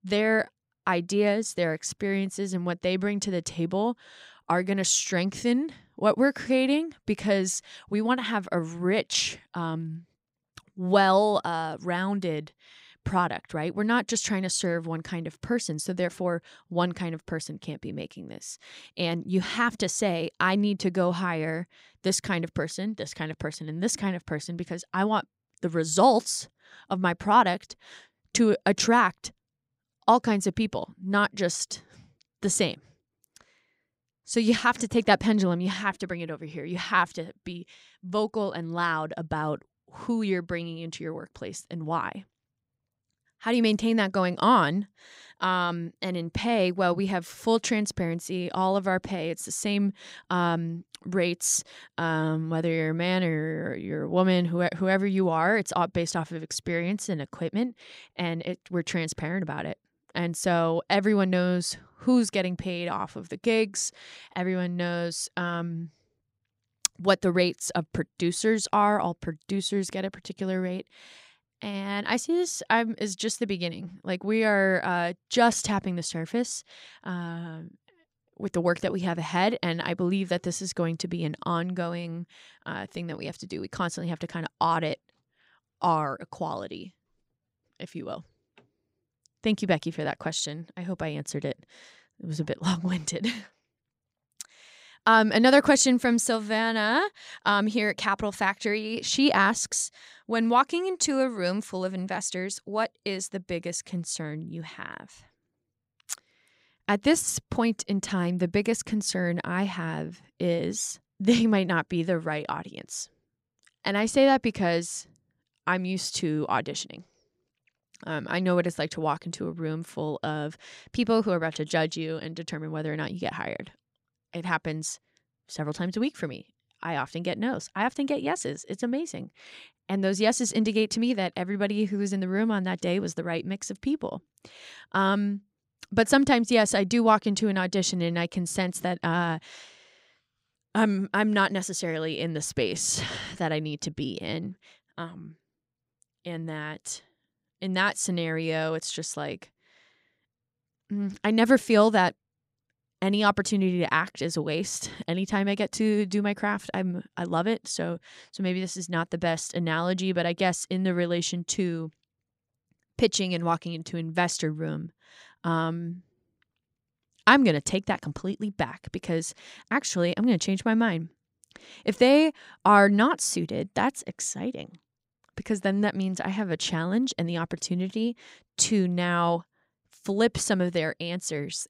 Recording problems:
none

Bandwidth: 15.5 kHz